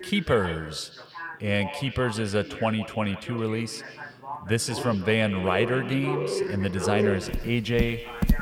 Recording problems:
echo of what is said; noticeable; throughout; 160 ms later, 15 dB below the speech
animal sounds; loud; throughout; 4 dB below the speech
voice in the background; noticeable; throughout; 15 dB below the speech

